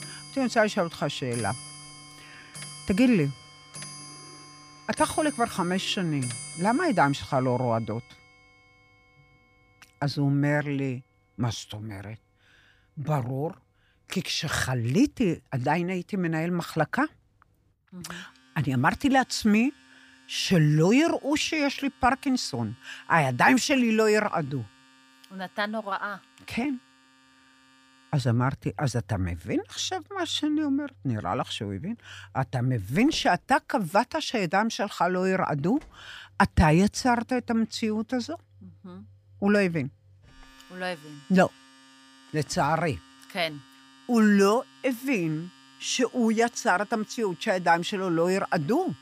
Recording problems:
household noises; faint; throughout; 20 dB below the speech

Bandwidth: 15 kHz